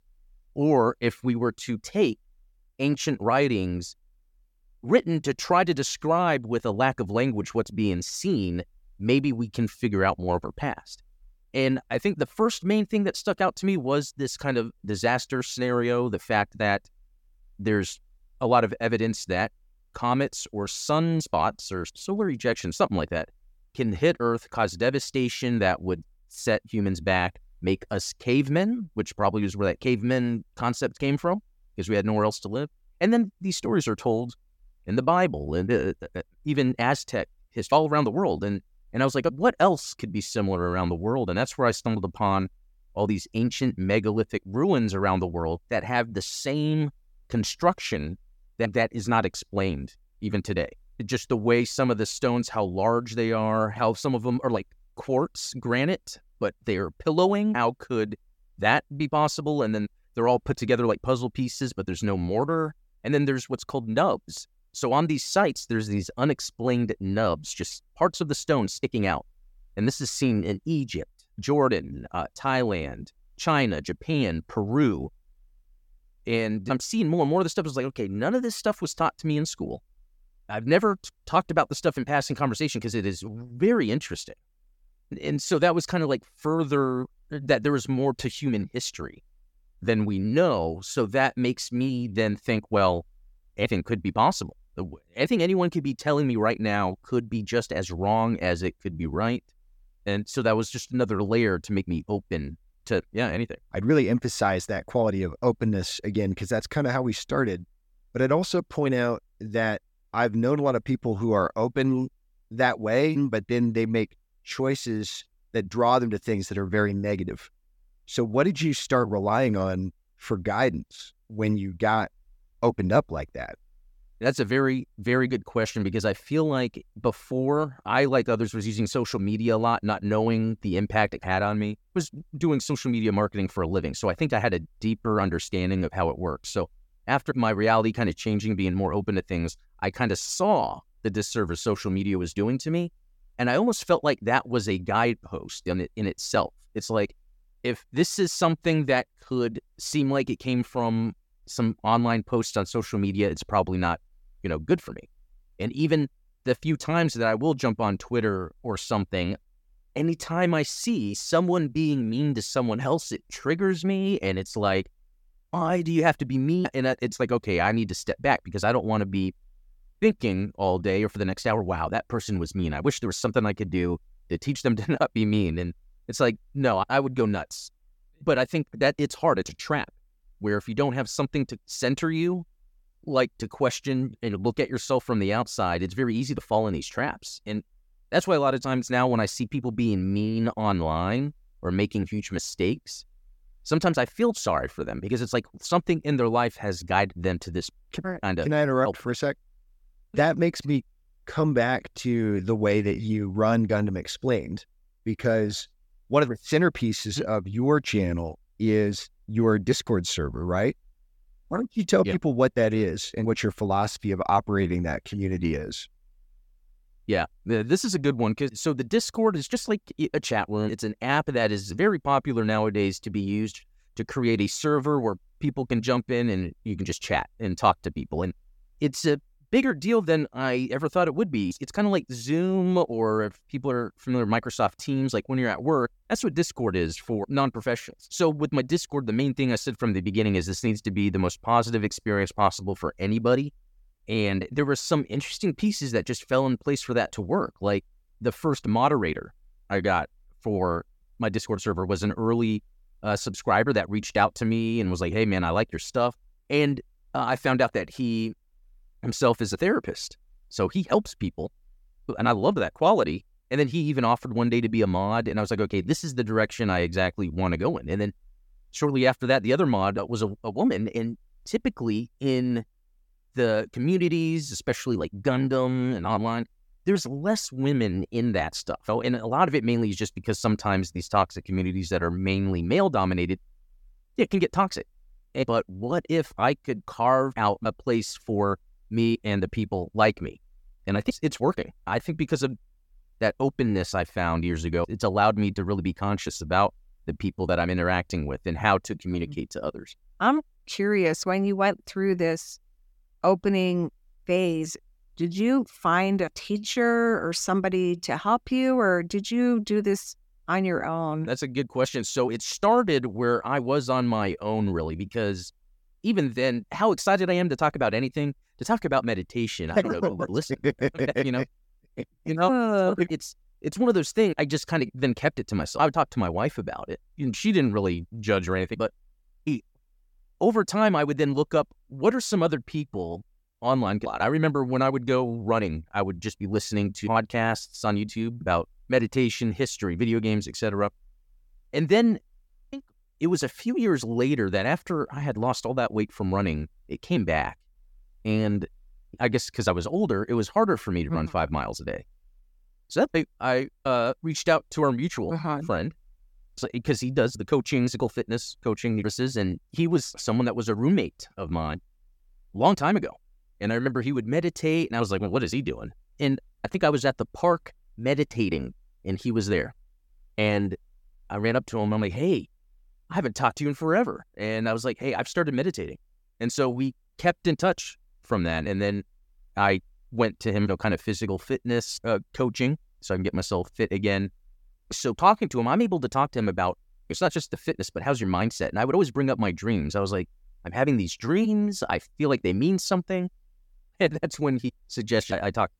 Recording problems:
none

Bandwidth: 17.5 kHz